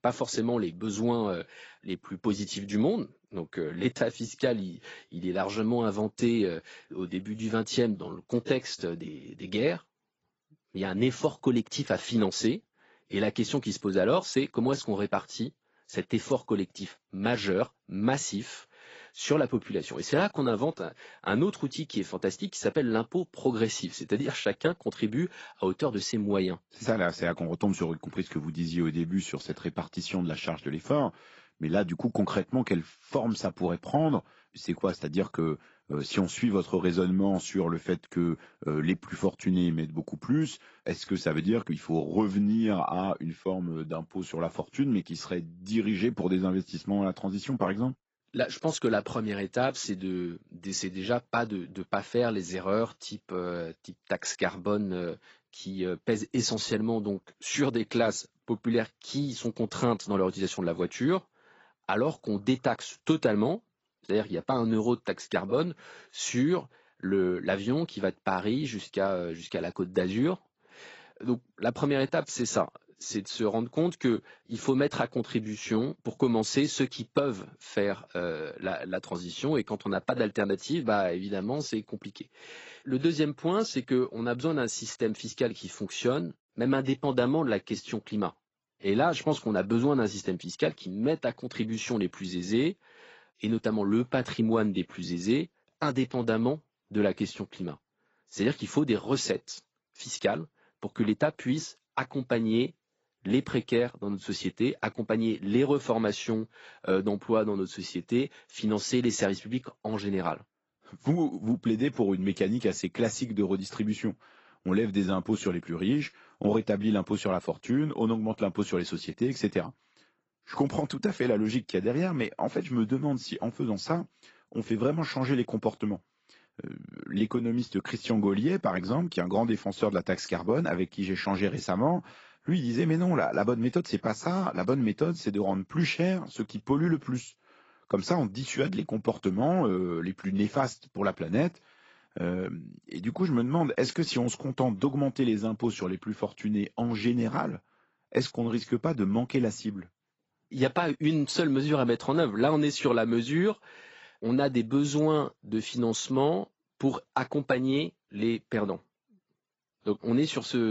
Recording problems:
garbled, watery; badly; nothing above 7.5 kHz
abrupt cut into speech; at the end

